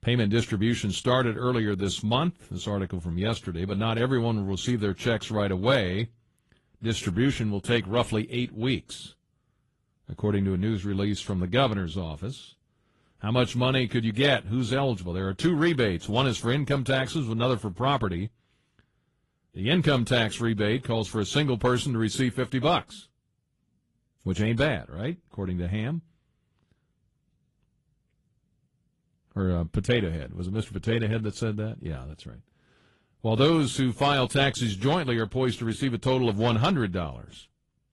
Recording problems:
garbled, watery; slightly; nothing above 11.5 kHz

